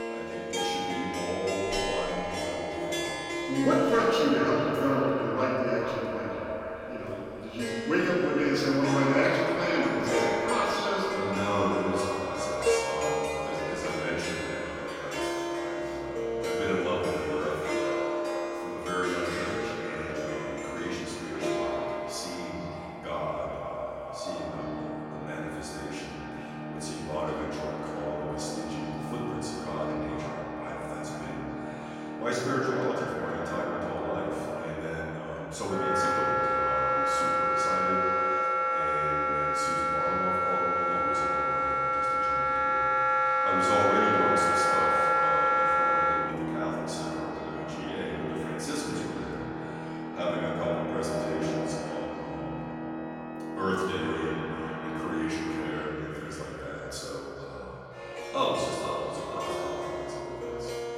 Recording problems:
echo of what is said; strong; throughout; 440 ms later, 7 dB below the speech
room echo; strong; dies away in 1.8 s
off-mic speech; far
background music; very loud; throughout; 2 dB above the speech

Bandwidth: 16 kHz